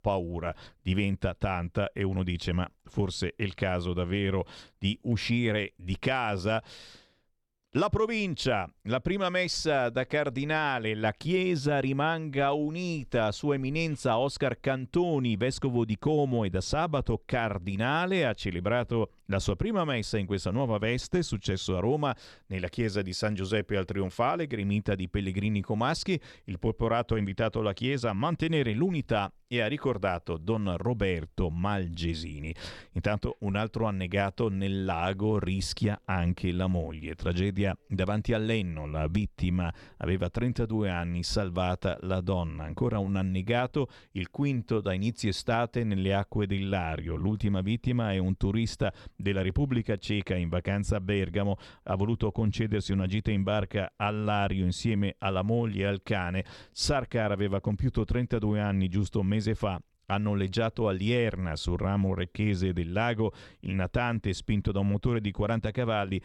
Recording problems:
none

